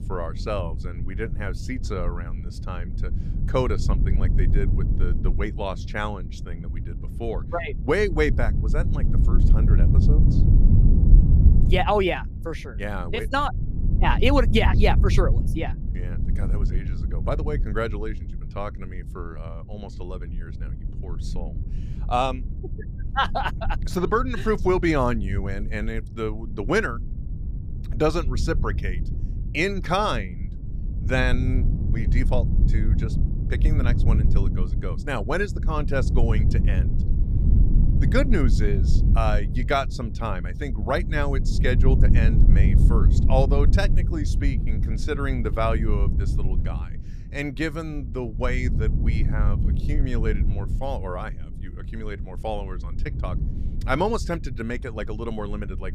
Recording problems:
low rumble; noticeable; throughout; 10 dB below the speech

